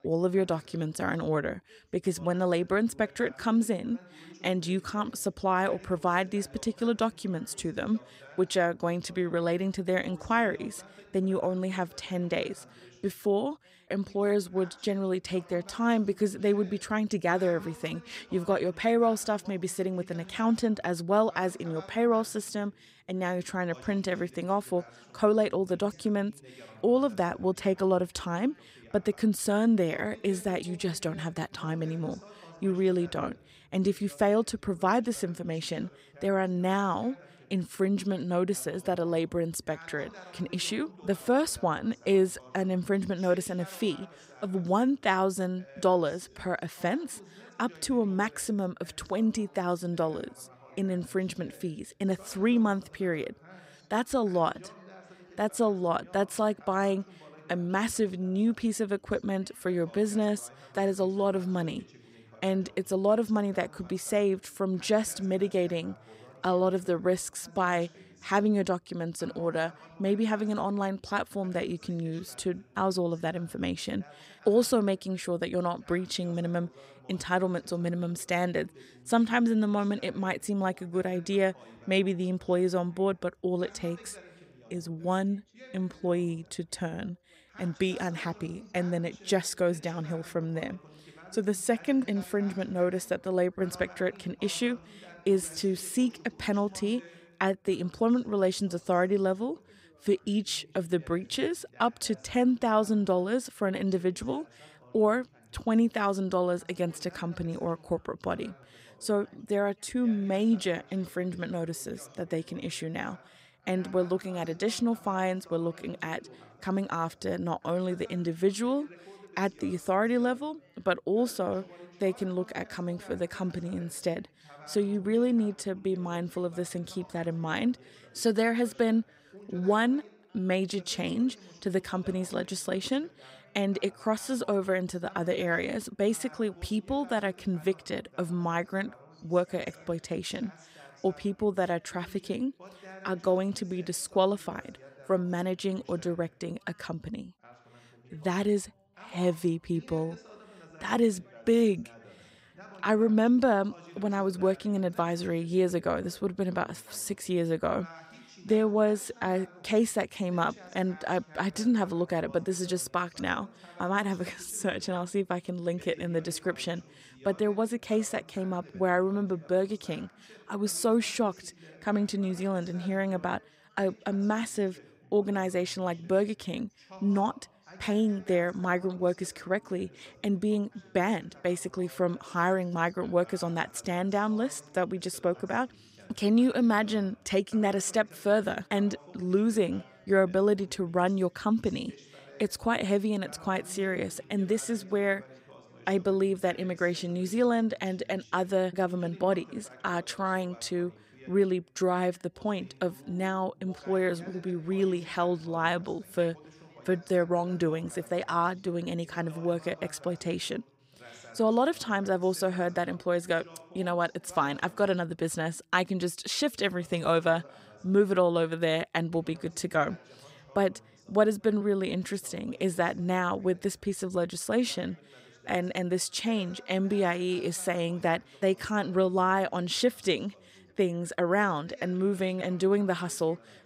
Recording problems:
background chatter; faint; throughout; 2 voices, 25 dB below the speech

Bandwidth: 15.5 kHz